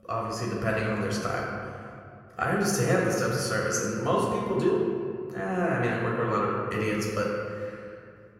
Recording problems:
off-mic speech; far
room echo; noticeable; dies away in 2.1 s

